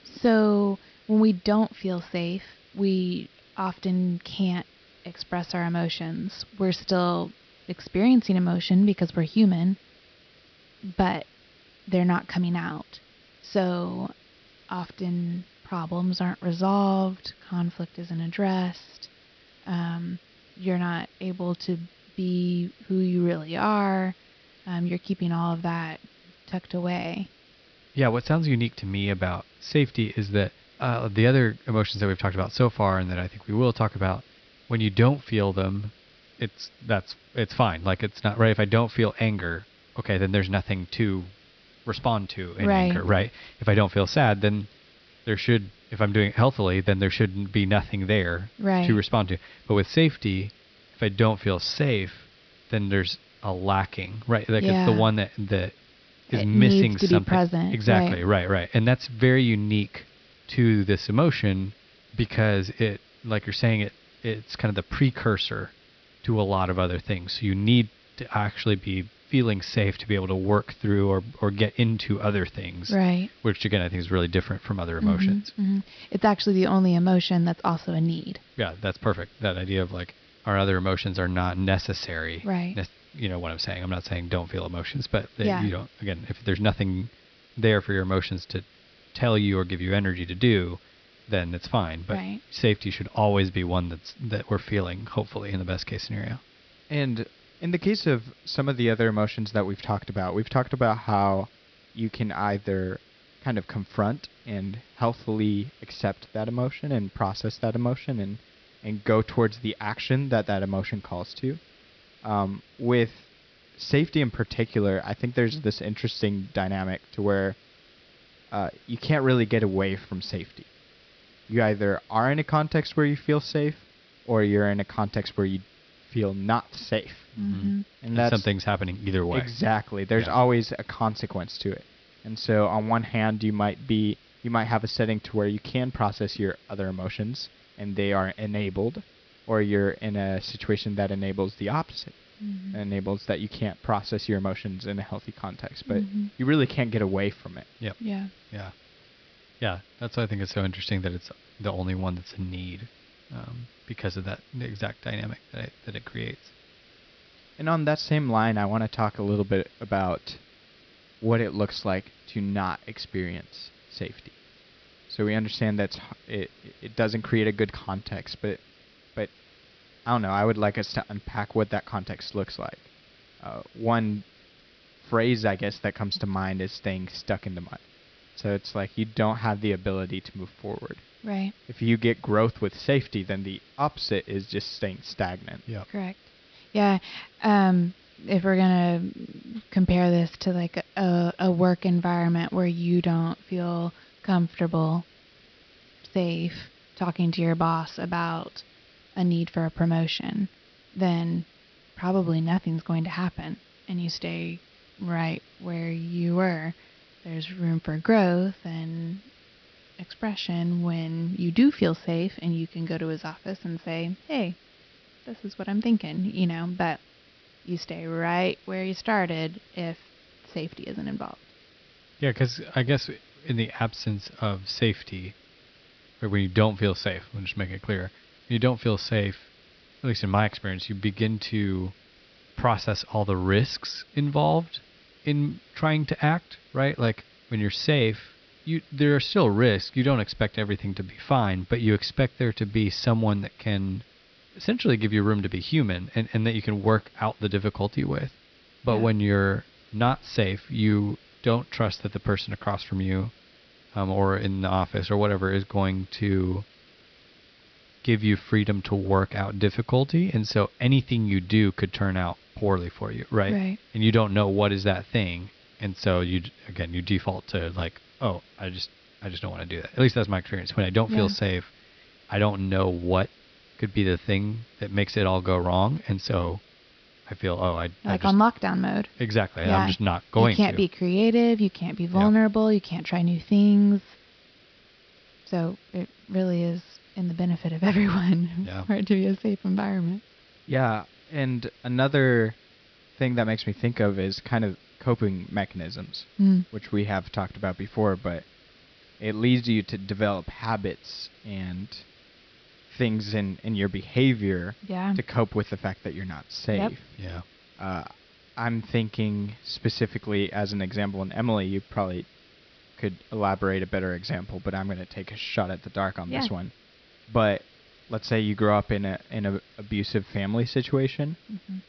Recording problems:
high frequencies cut off; noticeable; nothing above 5.5 kHz
hiss; faint; throughout; 30 dB below the speech

